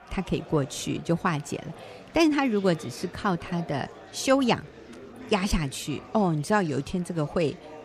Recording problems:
murmuring crowd; noticeable; throughout; 20 dB below the speech

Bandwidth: 14.5 kHz